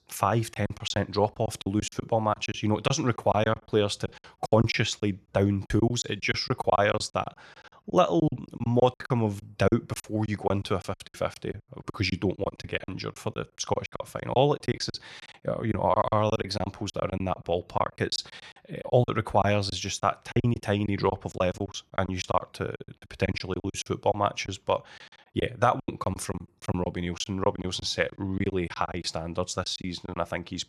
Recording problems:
choppy; very; 15% of the speech affected

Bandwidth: 13.5 kHz